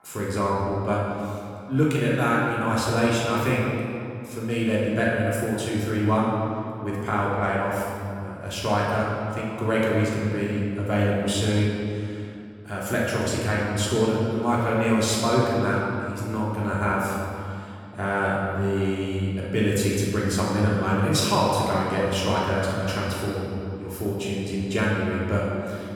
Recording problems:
room echo; strong; dies away in 2.3 s
off-mic speech; far
echo of what is said; faint; throughout; 290 ms later, 25 dB below the speech

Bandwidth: 17.5 kHz